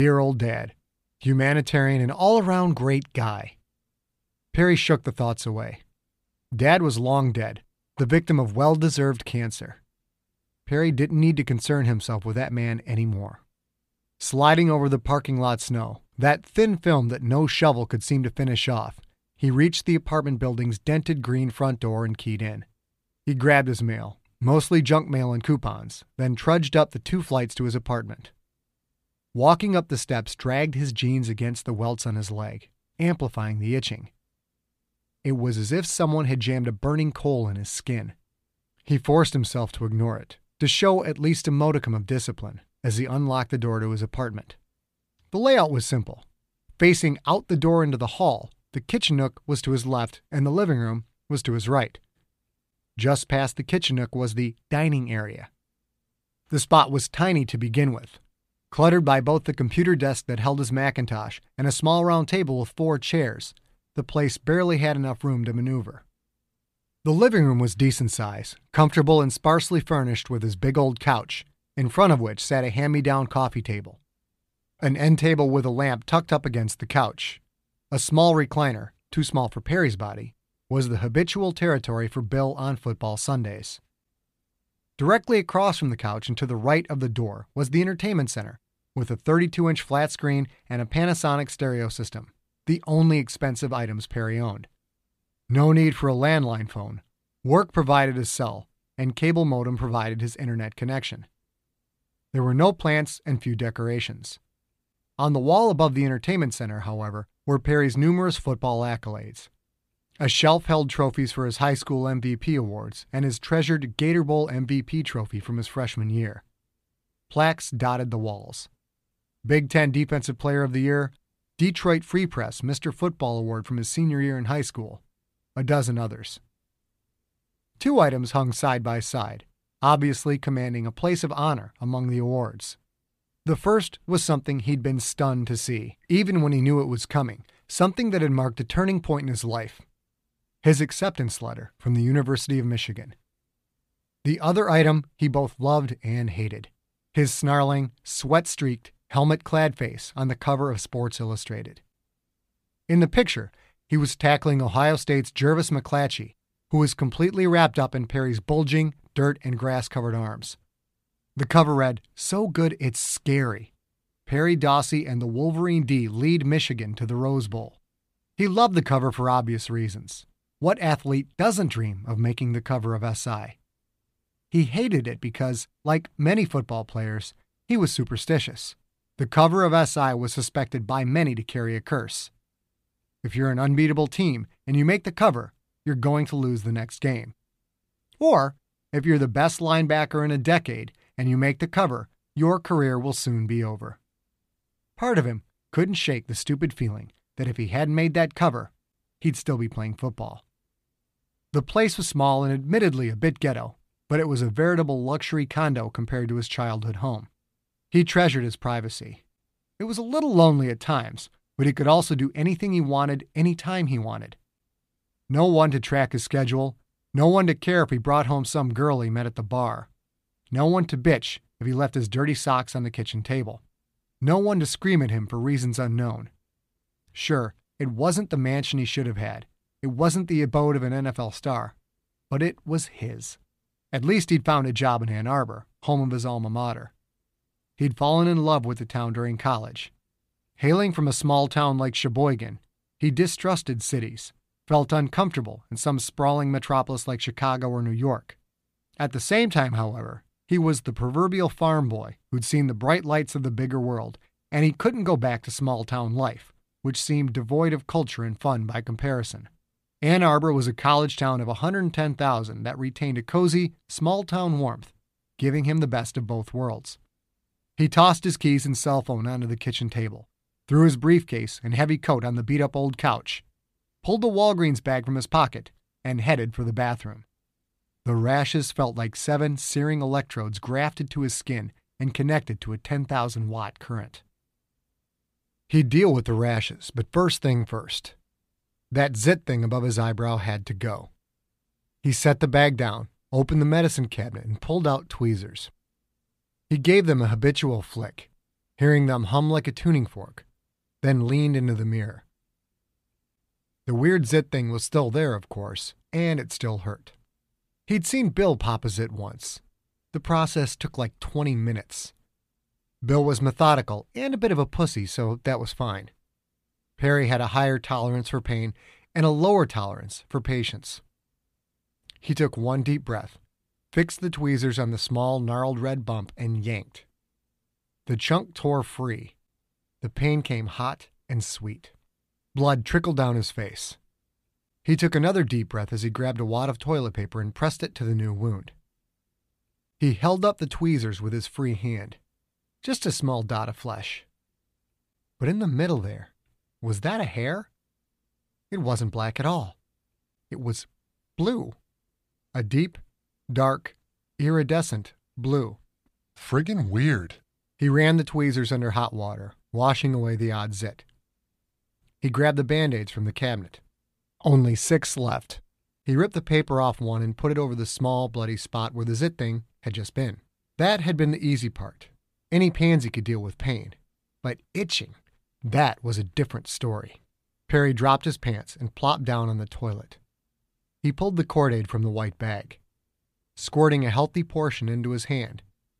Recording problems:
abrupt cut into speech; at the start

